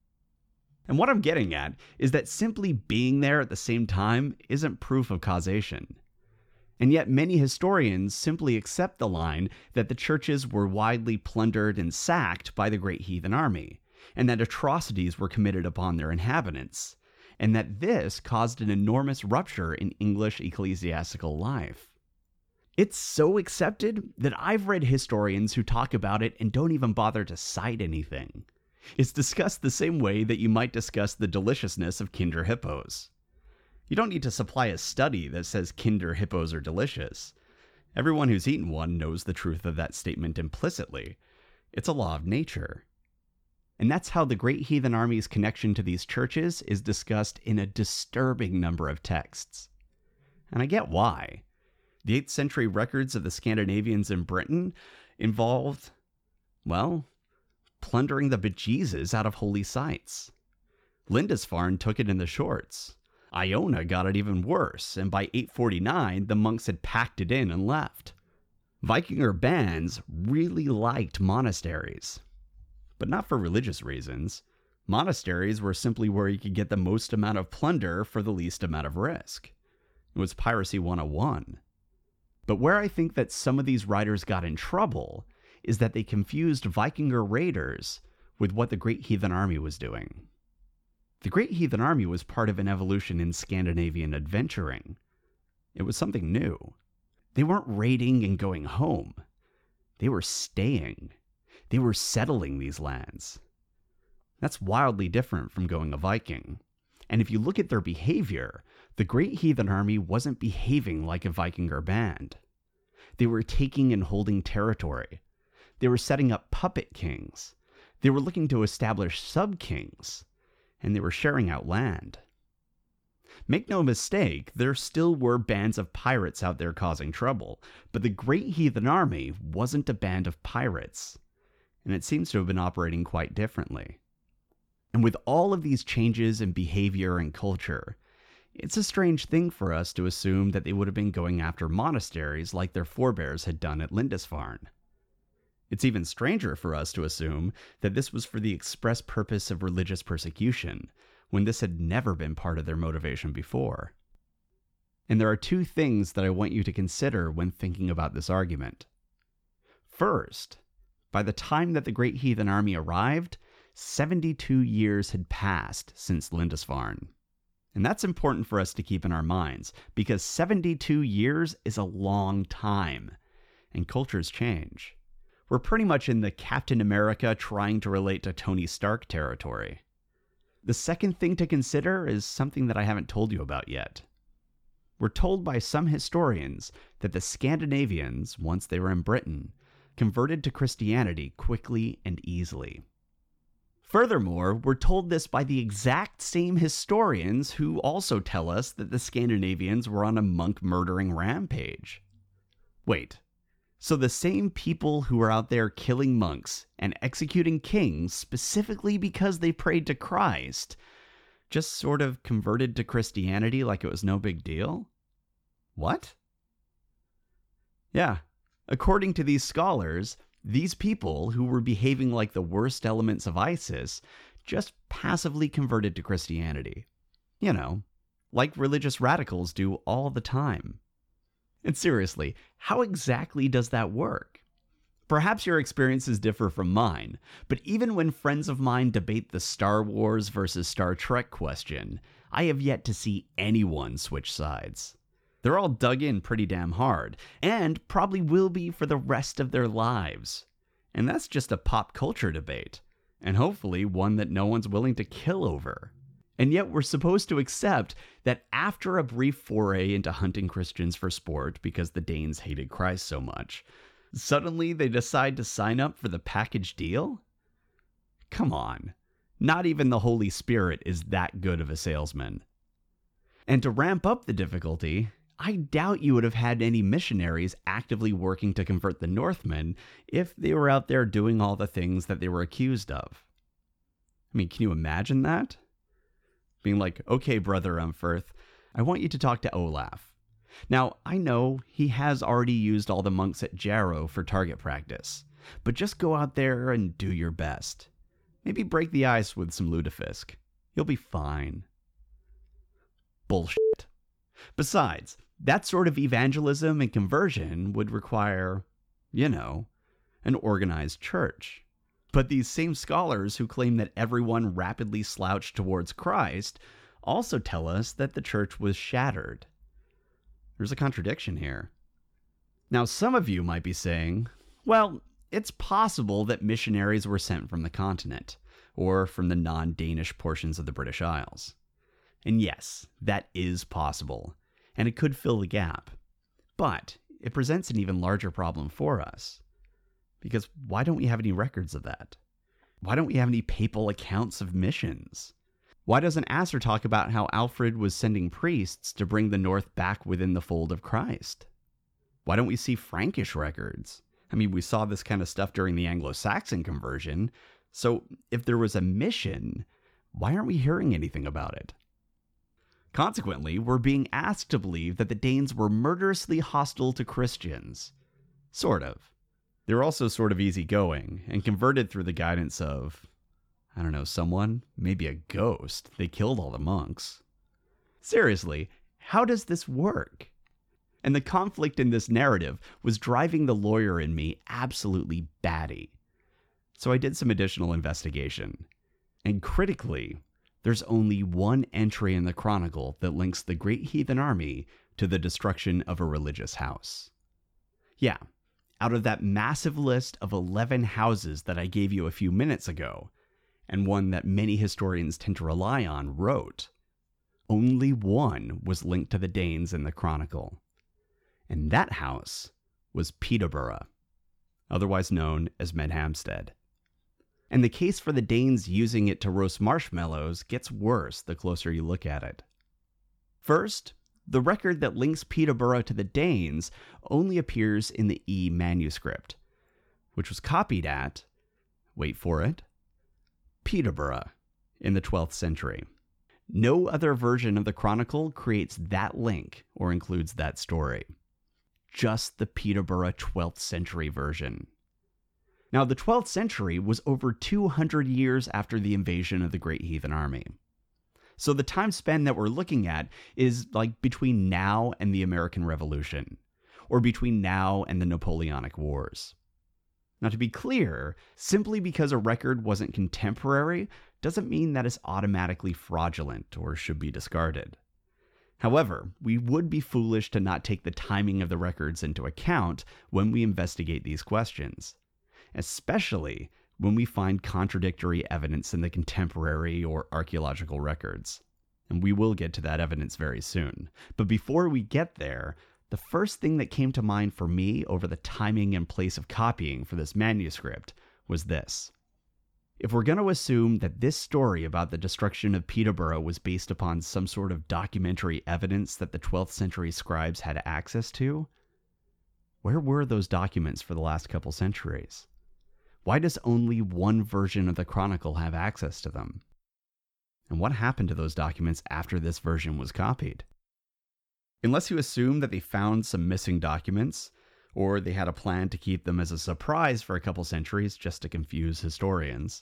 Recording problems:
none

